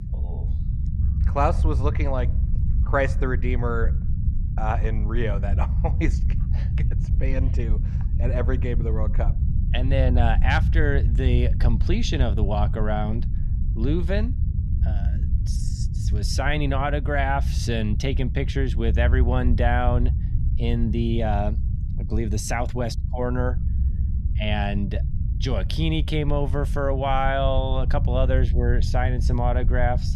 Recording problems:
low rumble; noticeable; throughout; 15 dB below the speech

